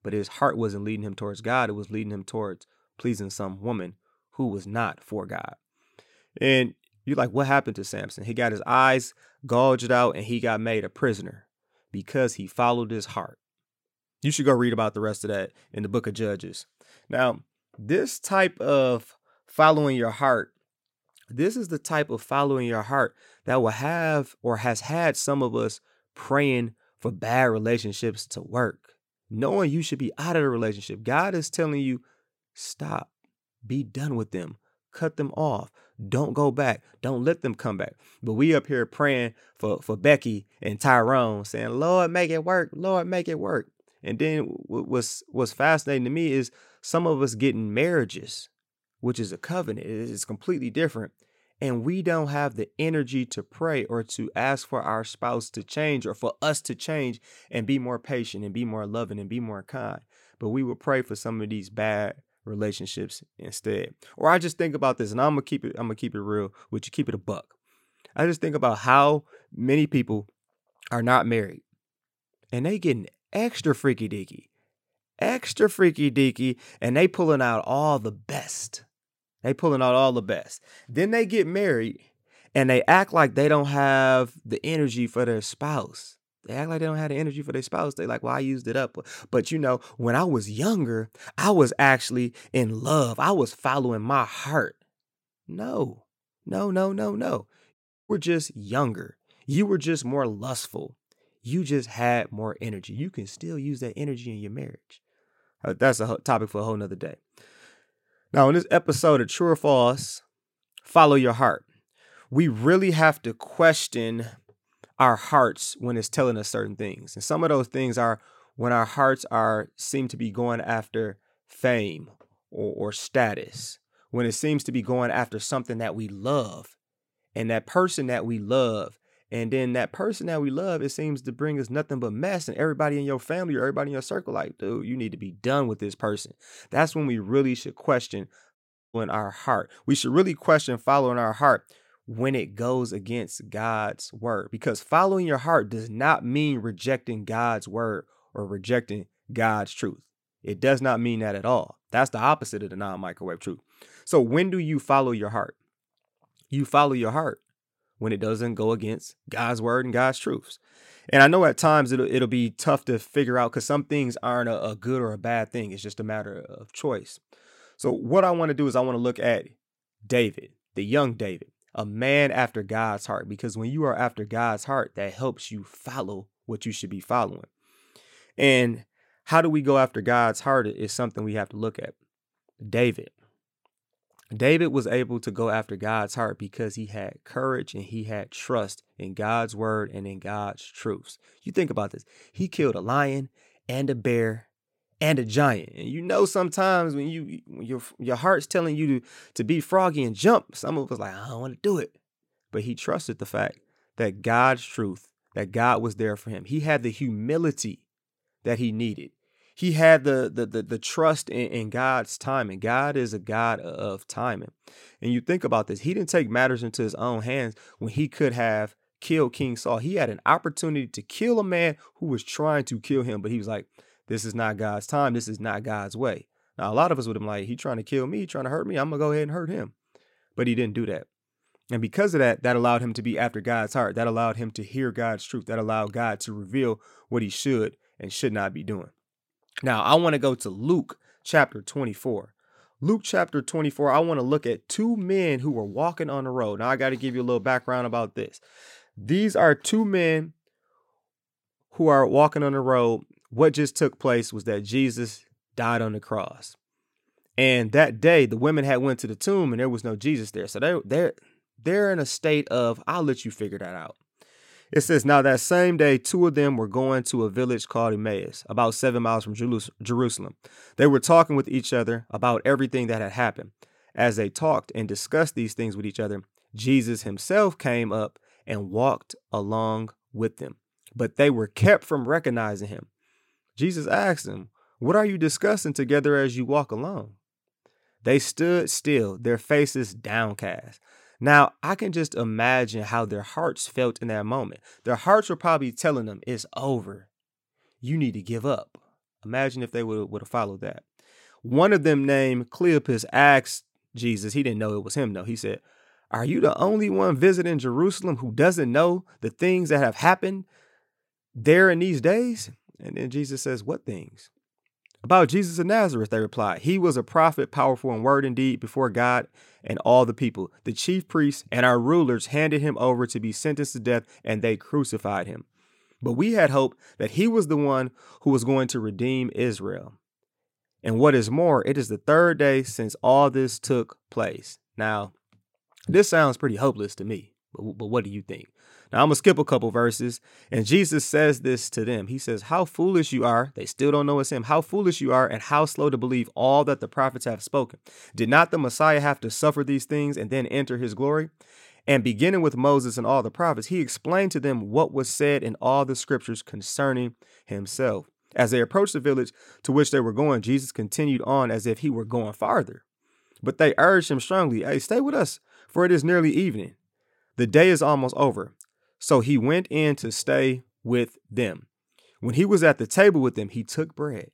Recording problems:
audio cutting out; at 1:38 and at 2:19

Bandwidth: 16.5 kHz